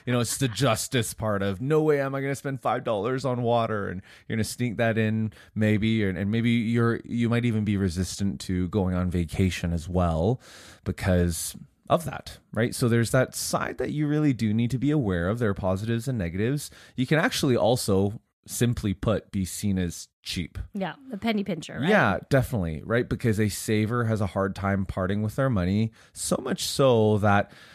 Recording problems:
none

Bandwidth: 14.5 kHz